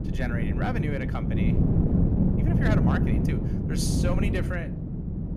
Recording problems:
wind noise on the microphone; heavy; as loud as the speech

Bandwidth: 14 kHz